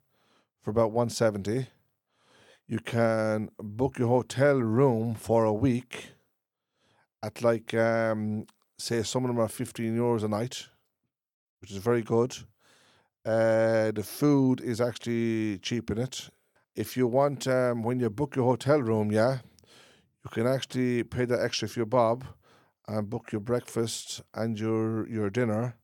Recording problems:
none

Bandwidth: 18 kHz